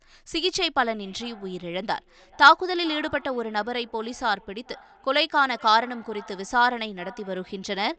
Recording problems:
high frequencies cut off; noticeable; nothing above 8 kHz
echo of what is said; faint; throughout; 440 ms later, 25 dB below the speech

